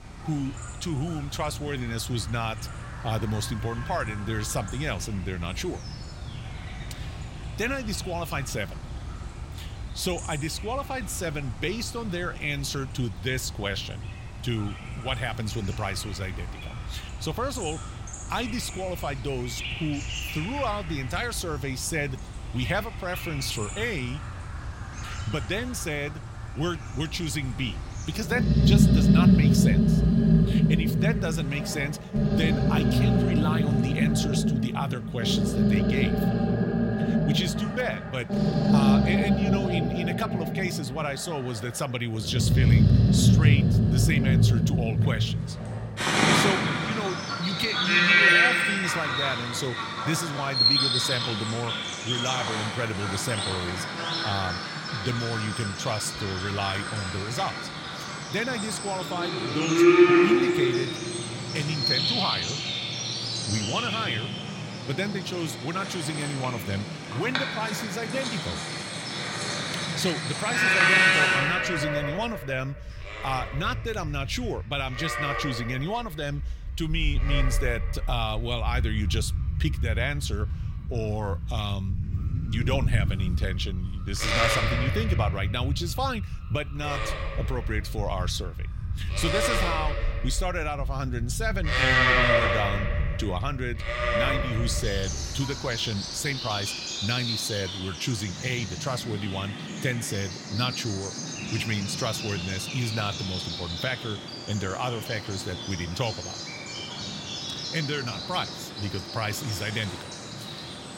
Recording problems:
animal sounds; very loud; throughout; 5 dB above the speech

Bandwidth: 16 kHz